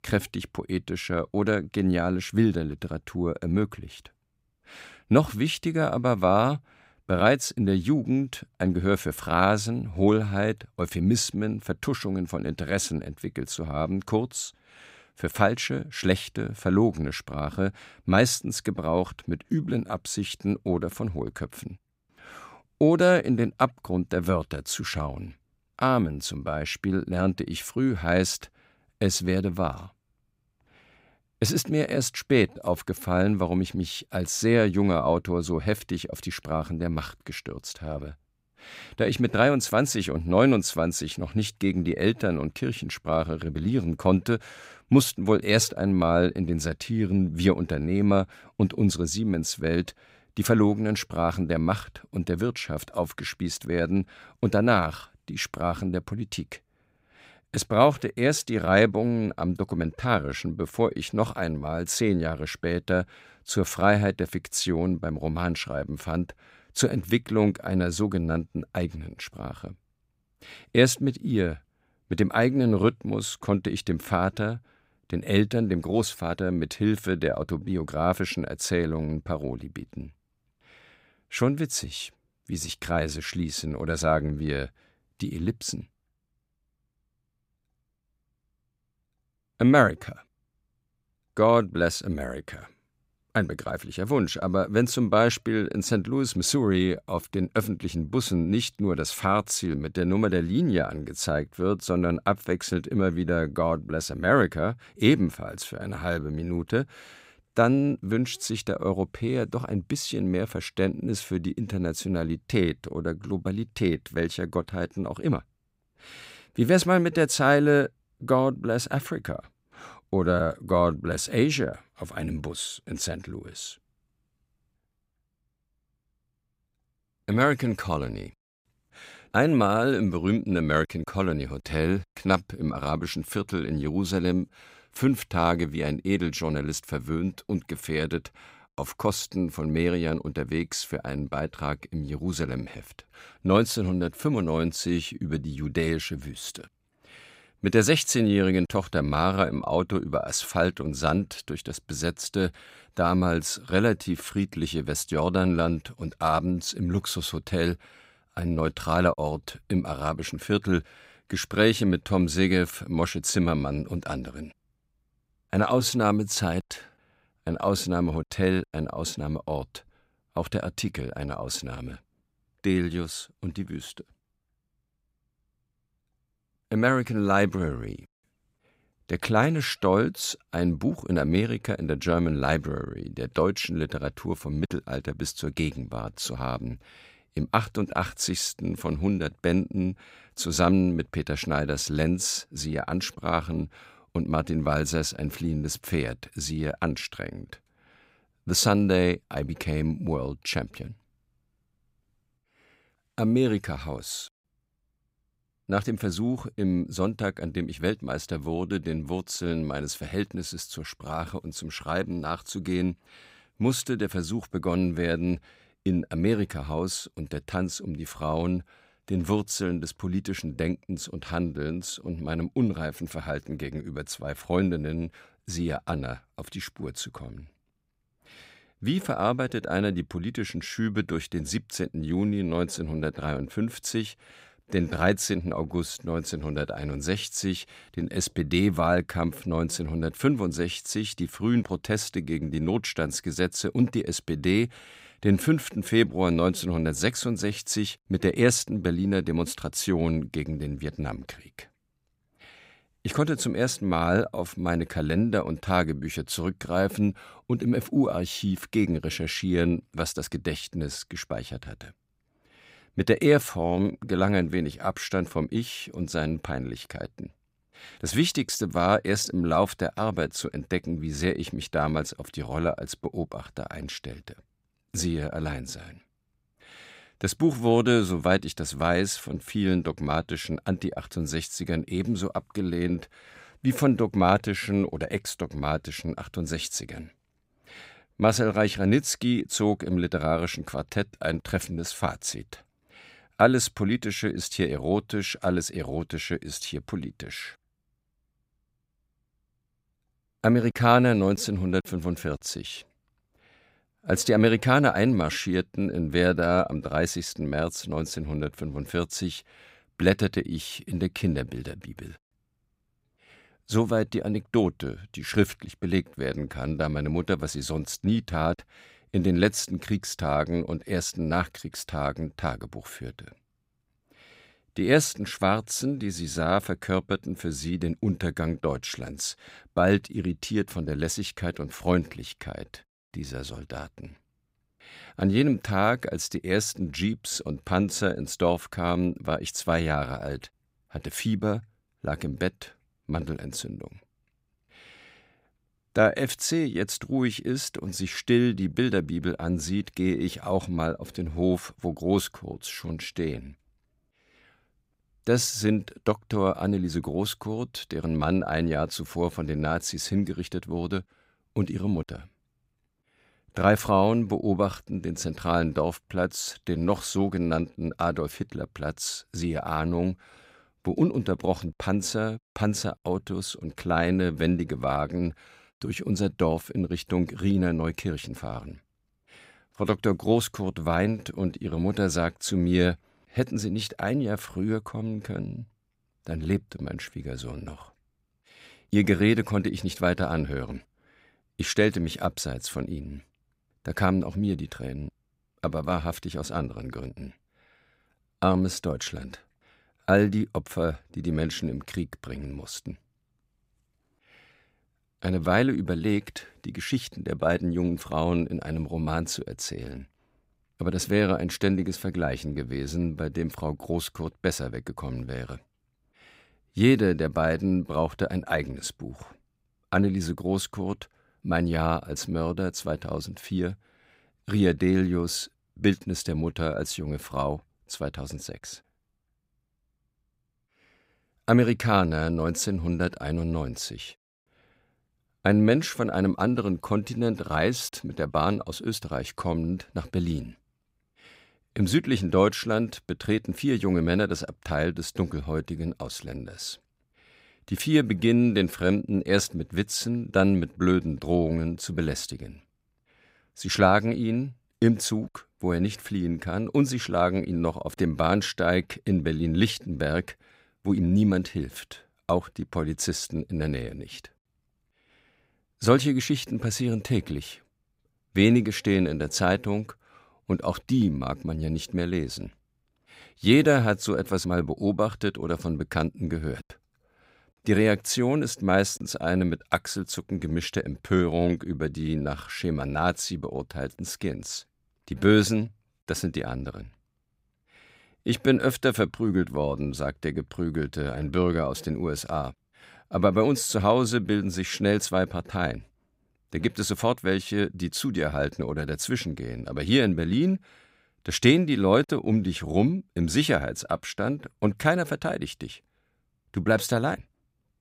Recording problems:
none

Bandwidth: 15.5 kHz